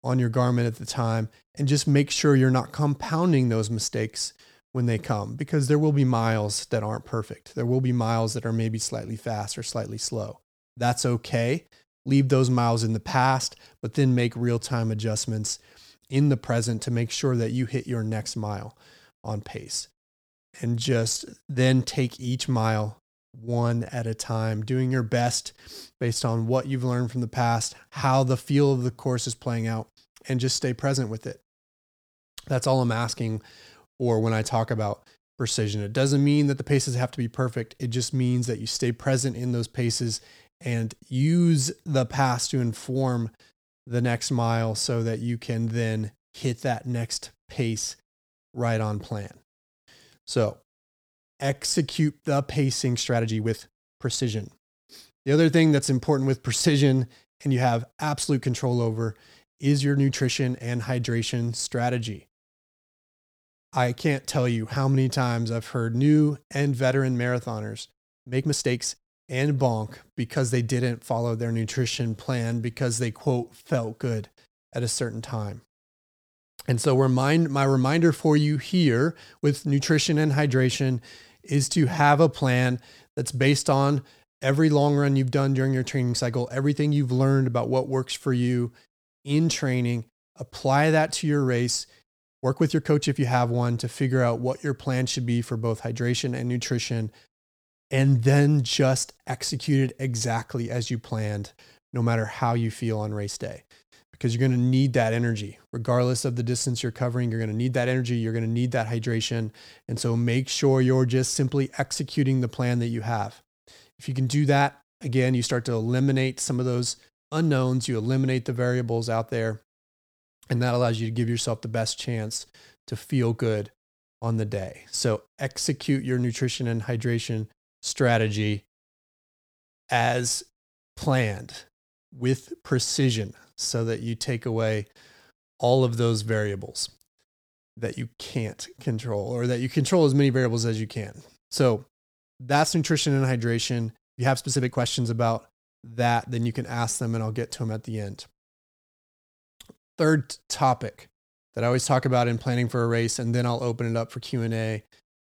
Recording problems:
uneven, jittery; strongly; from 14 s to 2:34

